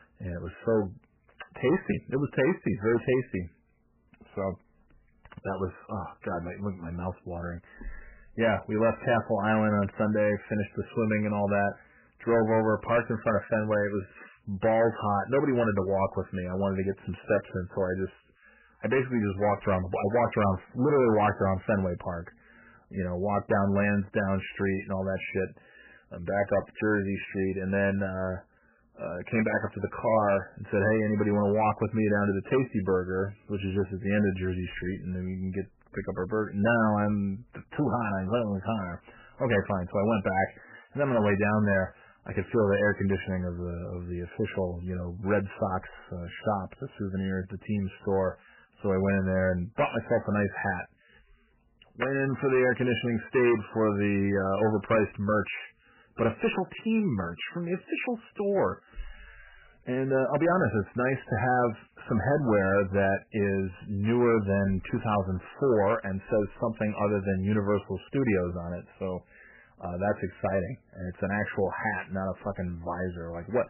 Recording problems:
garbled, watery; badly; nothing above 3 kHz
distortion; slight; 5% of the sound clipped

